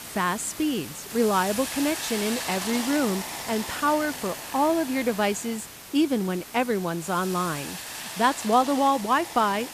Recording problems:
hiss; loud; throughout; 8 dB below the speech

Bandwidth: 14.5 kHz